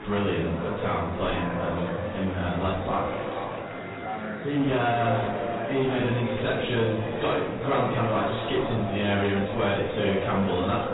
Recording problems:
echo of what is said; strong; throughout; 180 ms later, 7 dB below the speech
off-mic speech; far
garbled, watery; badly; nothing above 4 kHz
room echo; noticeable; dies away in 0.5 s
distortion; slight; 10 dB below the speech
murmuring crowd; loud; throughout; 7 dB below the speech
background music; noticeable; throughout; 20 dB below the speech

